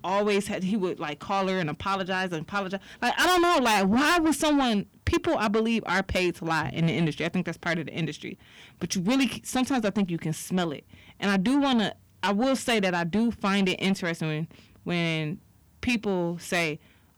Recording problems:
distortion; heavy; 6 dB below the speech

